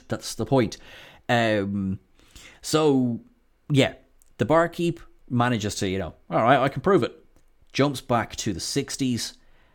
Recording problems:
none

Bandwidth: 17.5 kHz